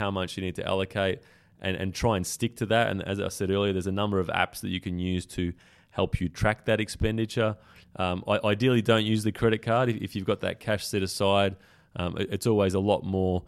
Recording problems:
abrupt cut into speech; at the start

